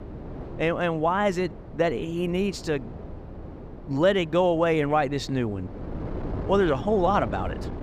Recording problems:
wind noise on the microphone; occasional gusts; 15 dB below the speech

